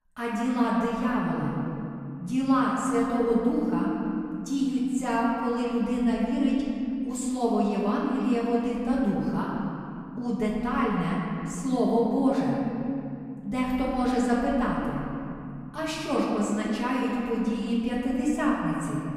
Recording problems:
off-mic speech; far
room echo; noticeable; dies away in 2.9 s

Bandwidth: 15.5 kHz